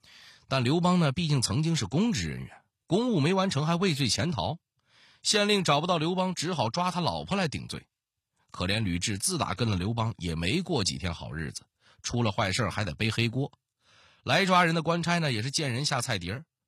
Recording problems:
none

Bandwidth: 14 kHz